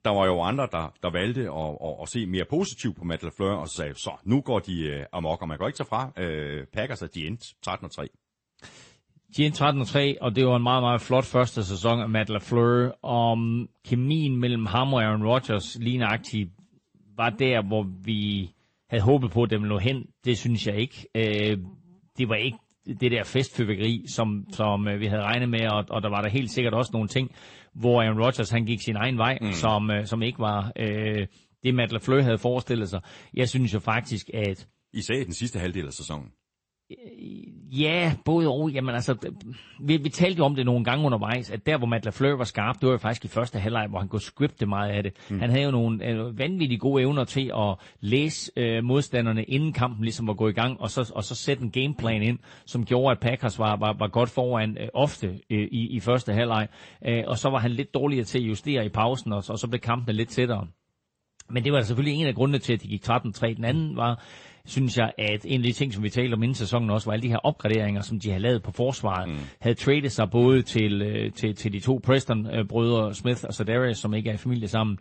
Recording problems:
garbled, watery; slightly; nothing above 8 kHz

